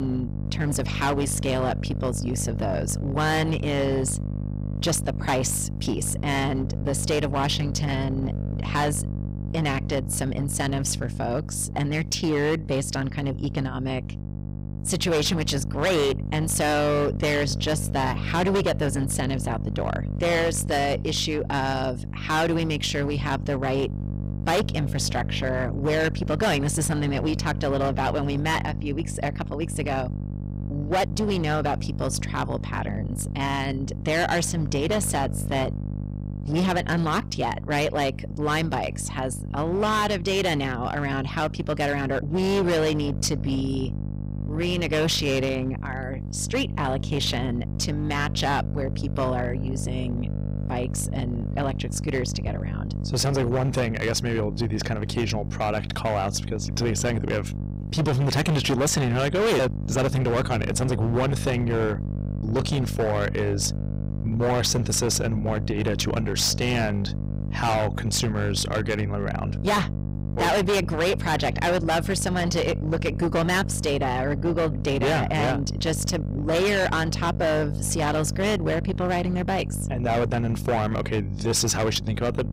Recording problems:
distortion; heavy; 14% of the sound clipped
electrical hum; noticeable; throughout; 50 Hz, 15 dB below the speech
abrupt cut into speech; at the start

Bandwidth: 15.5 kHz